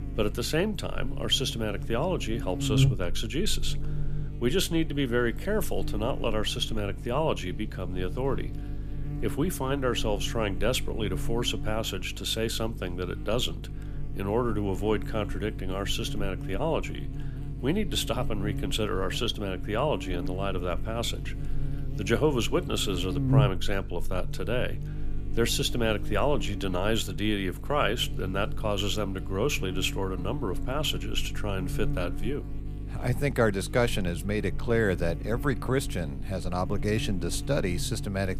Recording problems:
electrical hum; noticeable; throughout; 50 Hz, 15 dB below the speech

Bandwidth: 15 kHz